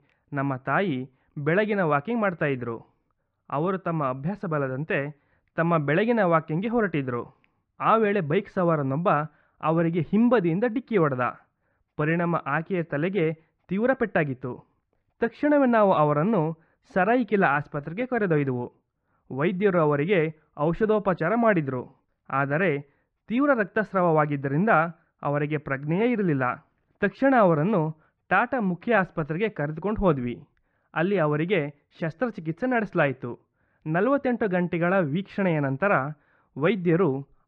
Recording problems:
muffled; very; fading above 1.5 kHz

